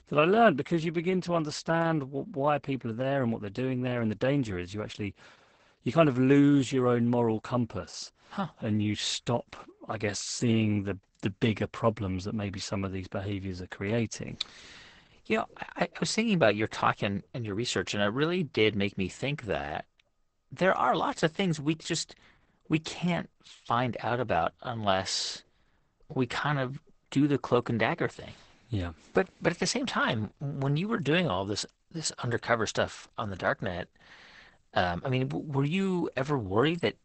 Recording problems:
garbled, watery; badly; nothing above 8 kHz

